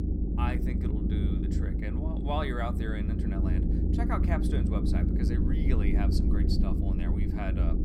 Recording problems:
low rumble; loud; throughout; as loud as the speech

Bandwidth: 16 kHz